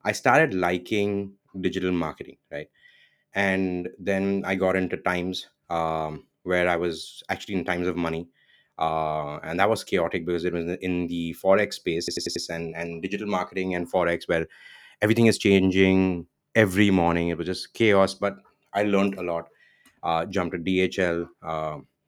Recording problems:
audio stuttering; at 12 s

